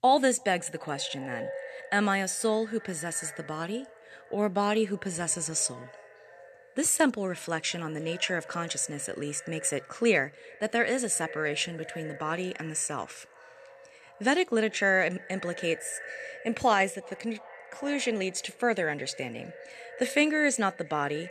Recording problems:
echo of what is said; noticeable; throughout; 350 ms later, 15 dB below the speech

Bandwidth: 13.5 kHz